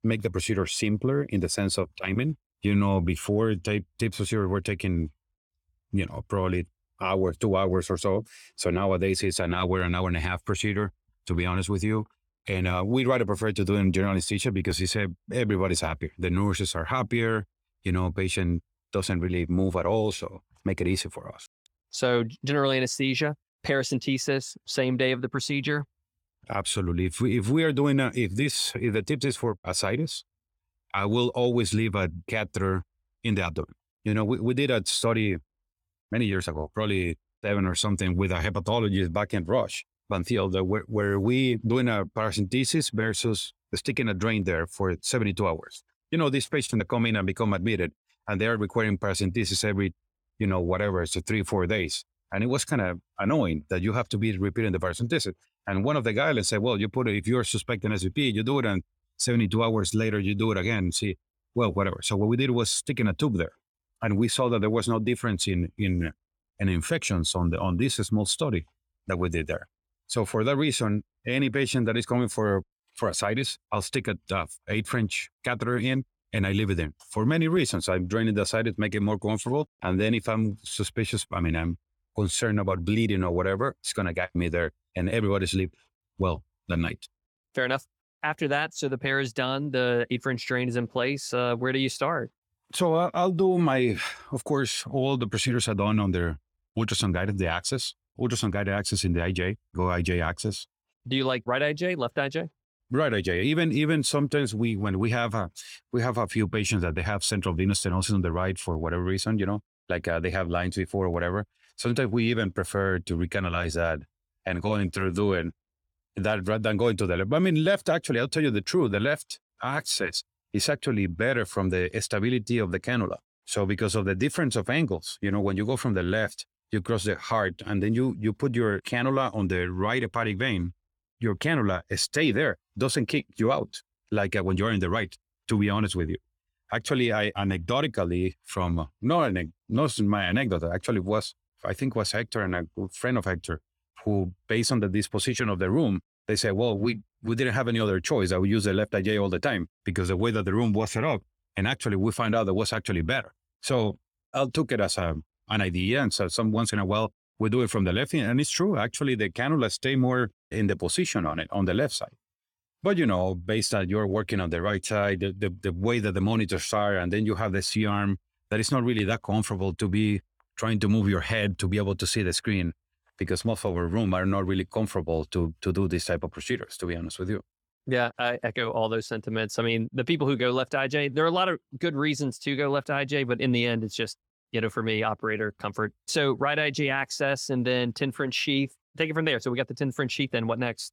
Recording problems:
none

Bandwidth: 18.5 kHz